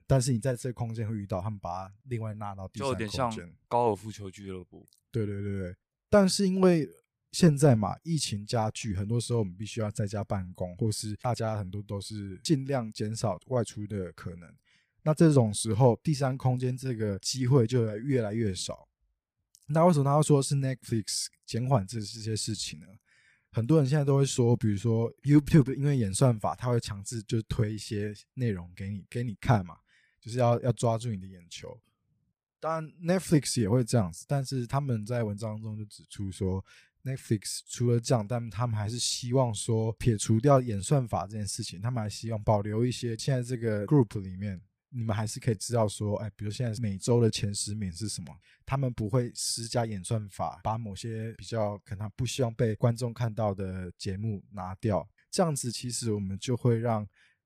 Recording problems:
none

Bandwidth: 15 kHz